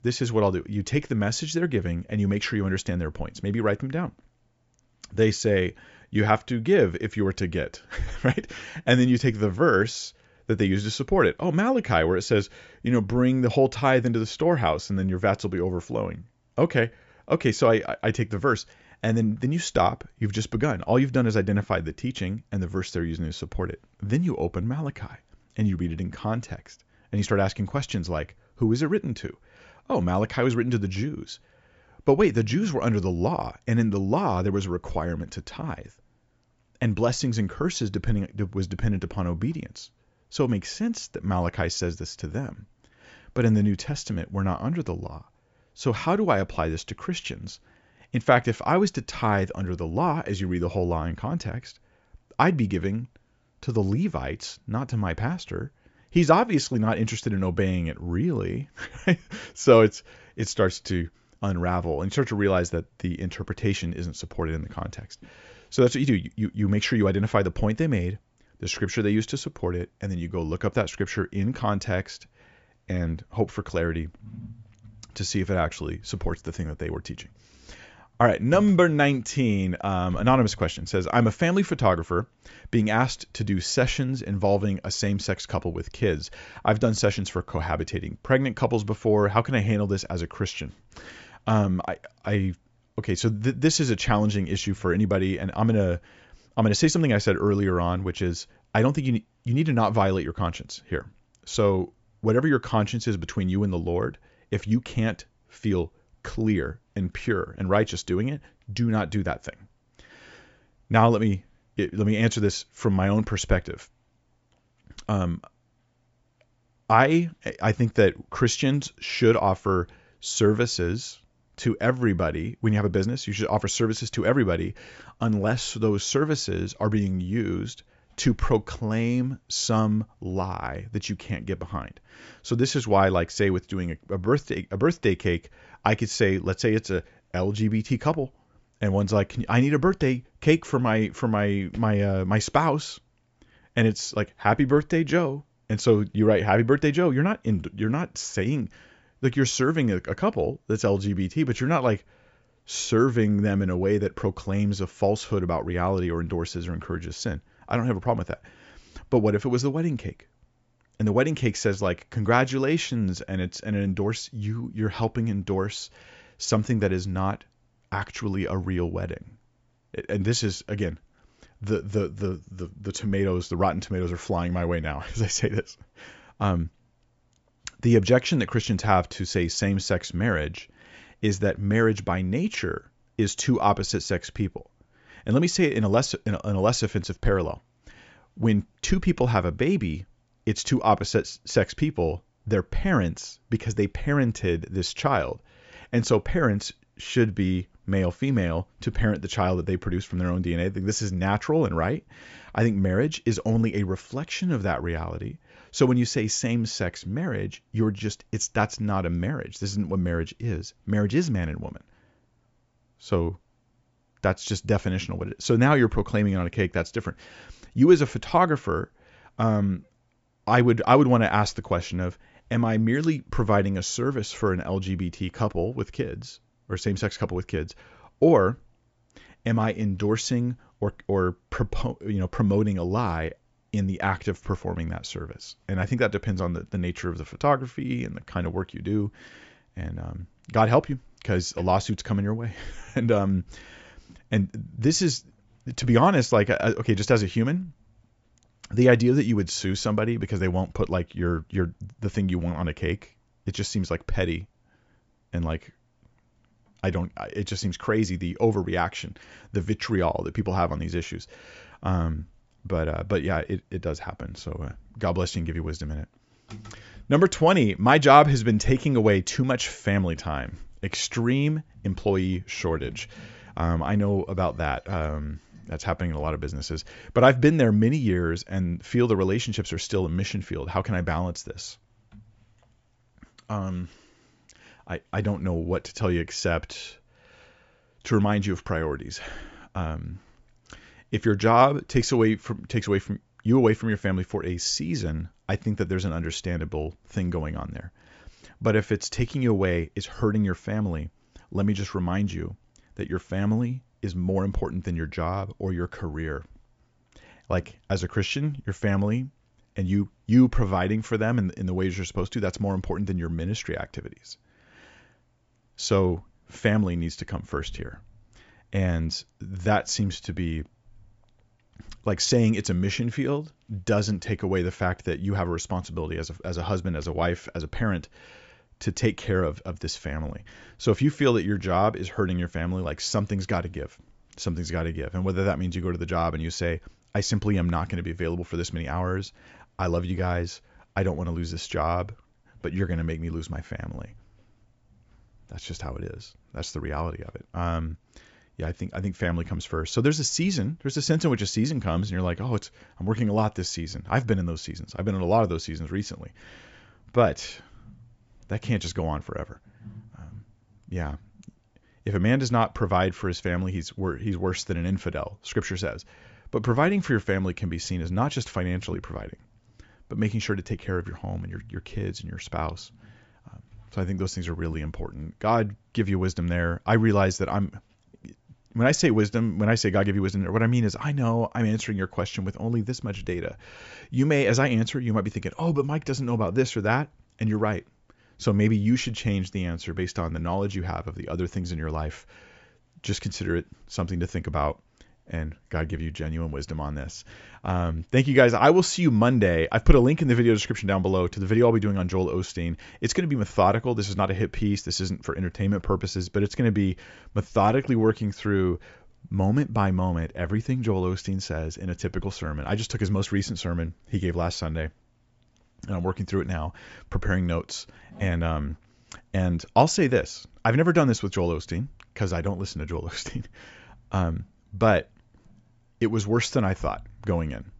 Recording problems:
high frequencies cut off; noticeable; nothing above 8 kHz

